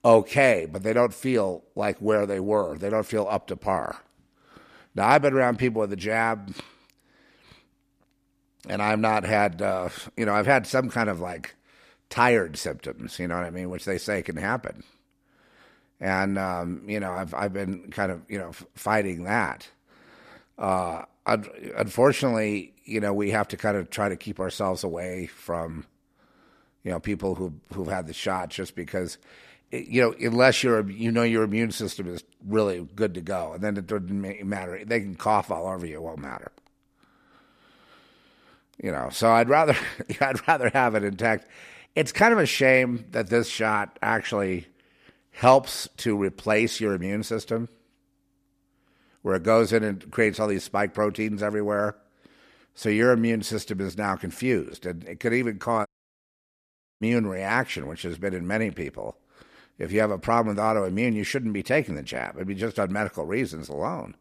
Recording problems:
audio cutting out; at 56 s for 1 s

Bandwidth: 14.5 kHz